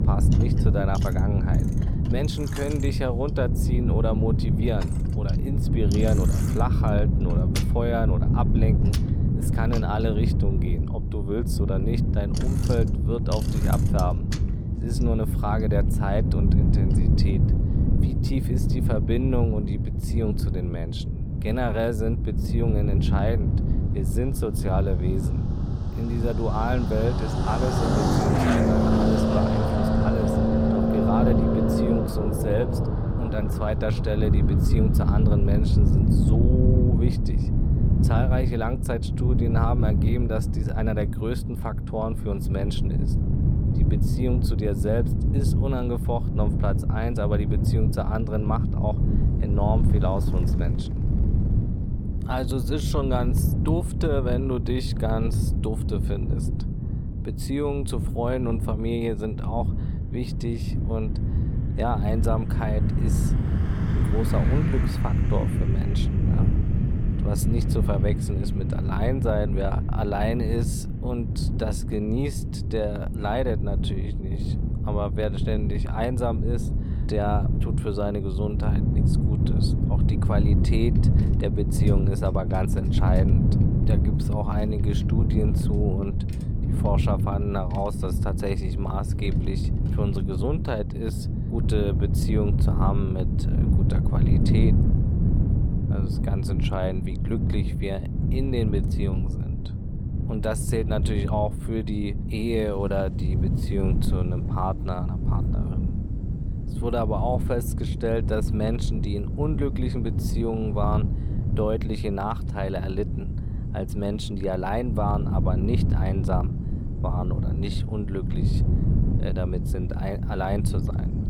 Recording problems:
traffic noise; very loud; throughout; 1 dB above the speech
wind noise on the microphone; heavy; 5 dB below the speech

